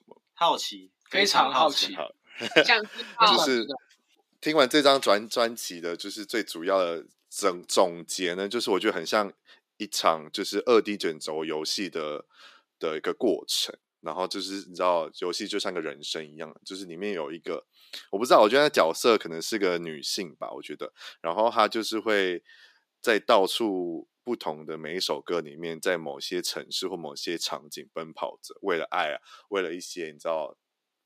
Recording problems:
thin; somewhat; fading below 300 Hz

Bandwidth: 15 kHz